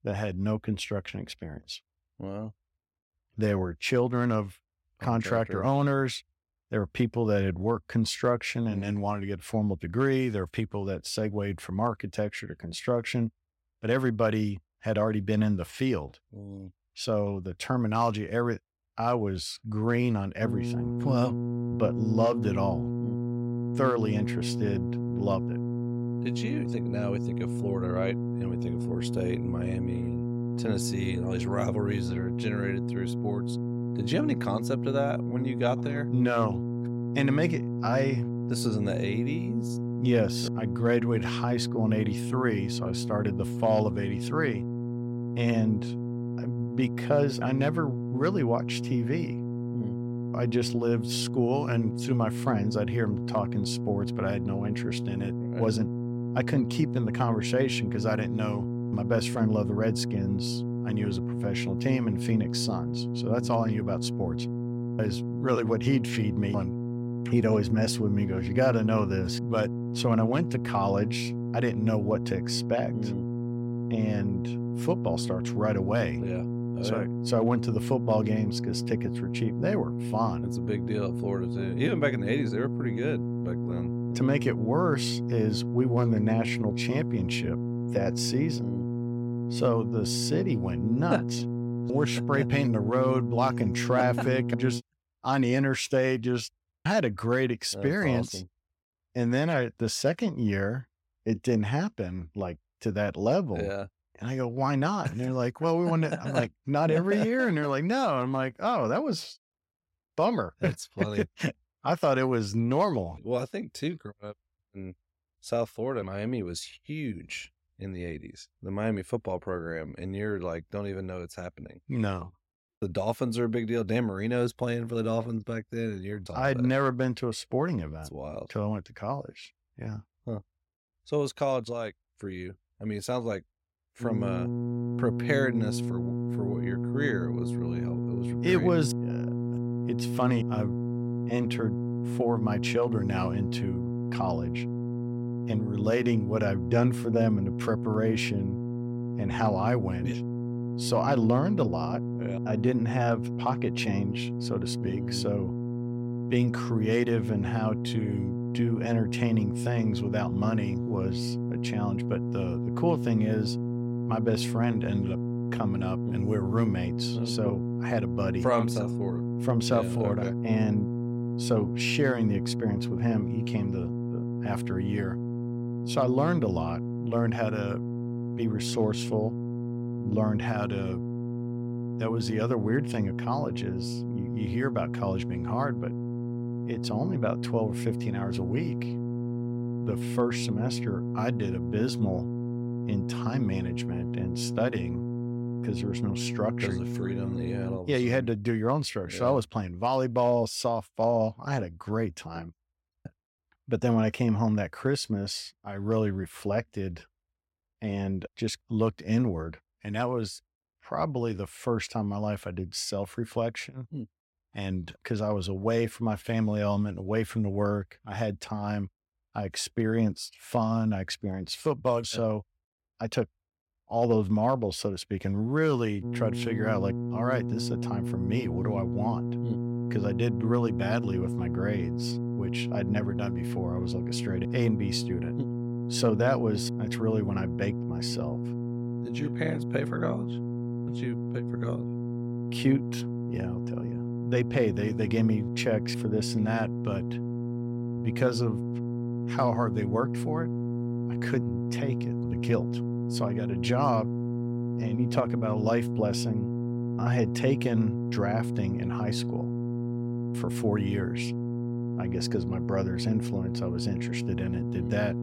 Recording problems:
electrical hum; loud; from 20 s to 1:35, from 2:14 to 3:18 and from 3:46 on; 60 Hz, 7 dB below the speech

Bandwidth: 16 kHz